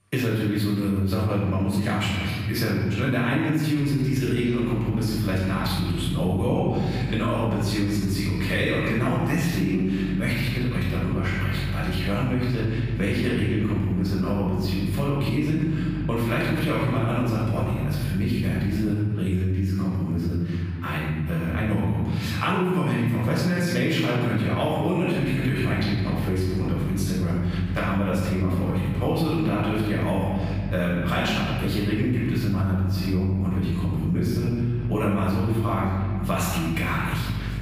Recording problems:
room echo; strong; dies away in 1.3 s
off-mic speech; far
squashed, flat; somewhat
electrical hum; faint; from 4 to 19 s and from 25 s on; 50 Hz, 20 dB below the speech

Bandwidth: 15 kHz